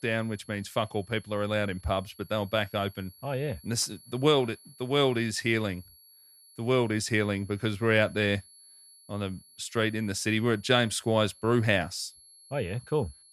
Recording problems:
high-pitched whine; faint; throughout; 11 kHz, 25 dB below the speech

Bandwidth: 14 kHz